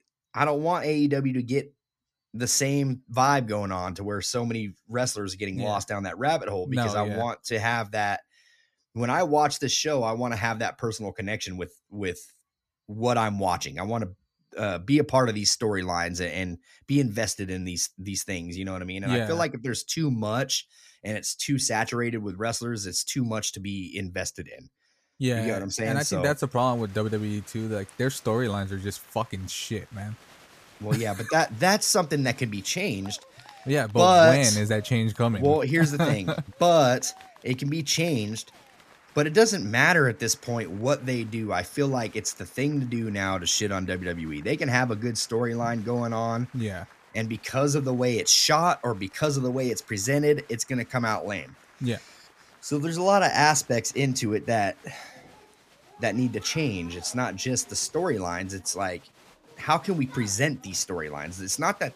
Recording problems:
crowd noise; faint; from 26 s on; 25 dB below the speech

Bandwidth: 14.5 kHz